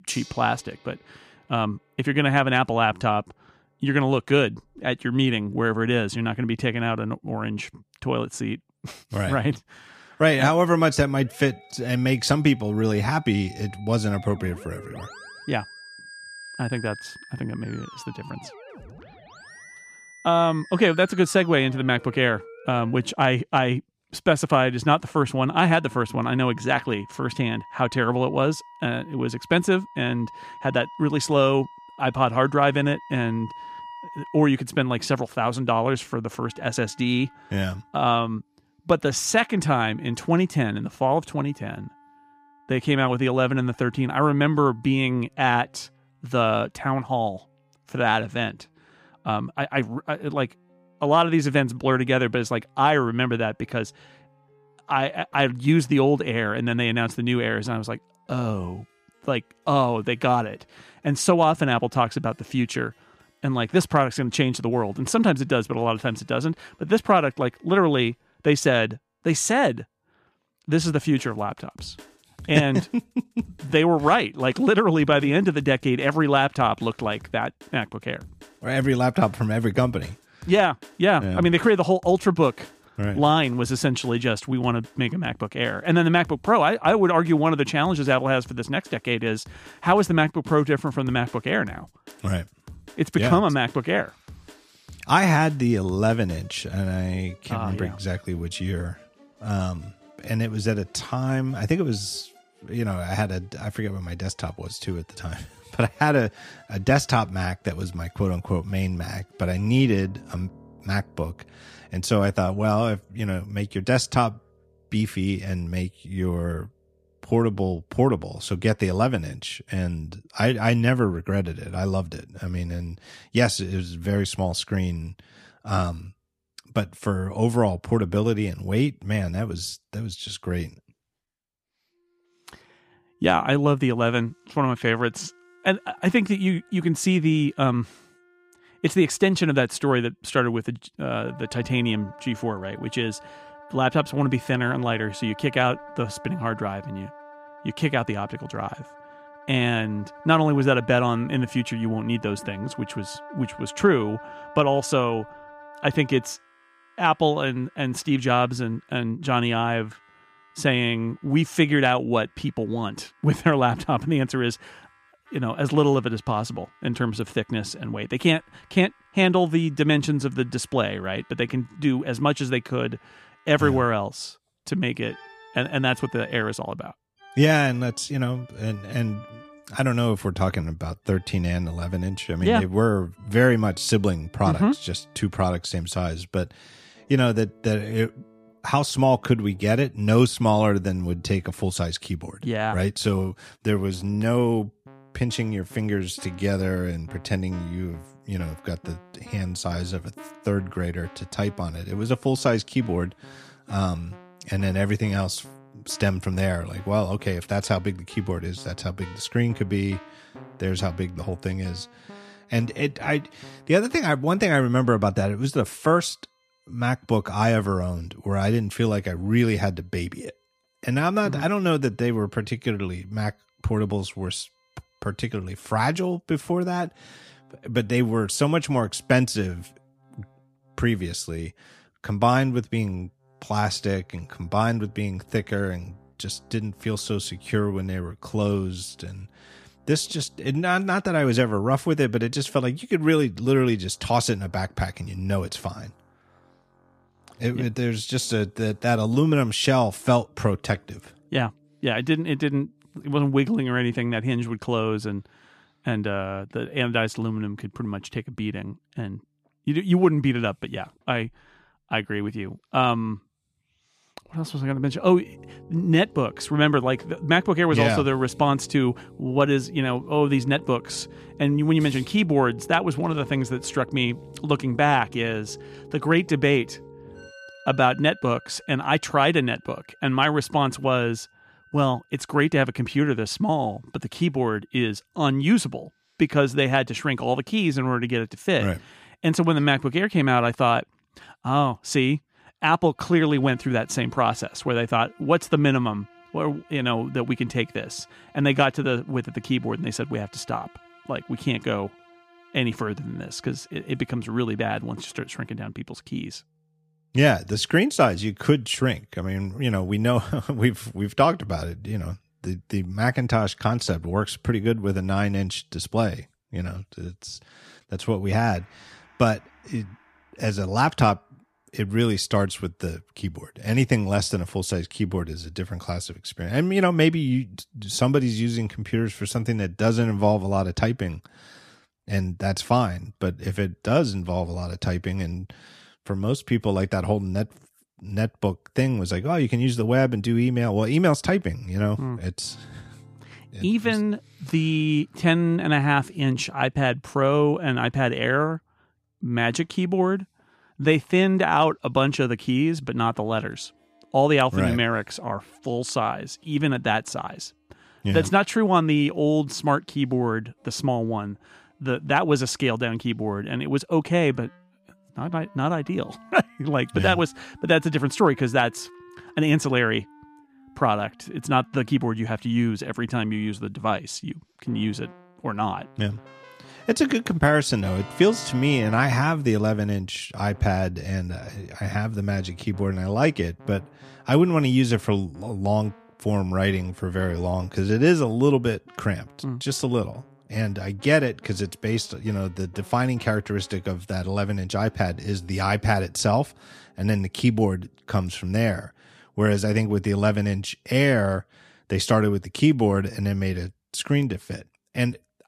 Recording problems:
background music; faint; throughout; 25 dB below the speech

